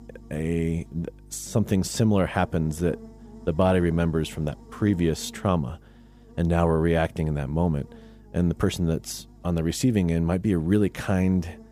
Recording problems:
electrical hum; faint; throughout; 50 Hz, 25 dB below the speech

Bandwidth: 15 kHz